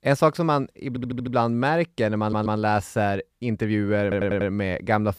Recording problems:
audio stuttering; at 1 s, at 2 s and at 4 s

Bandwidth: 15 kHz